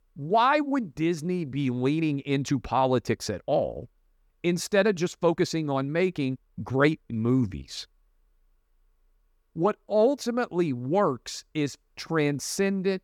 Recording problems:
uneven, jittery; strongly; from 1 to 12 s

